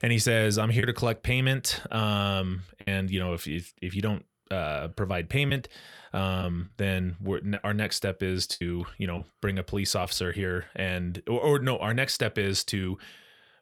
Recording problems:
choppy; occasionally; from 1 to 3 s, from 5 to 7.5 s and from 8.5 to 10 s; 5% of the speech affected

